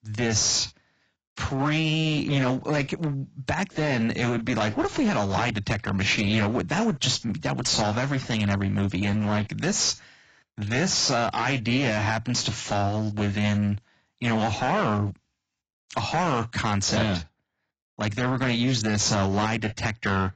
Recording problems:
garbled, watery; badly; nothing above 7.5 kHz
distortion; slight; 11% of the sound clipped

